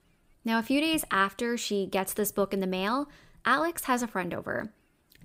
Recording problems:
none

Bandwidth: 15.5 kHz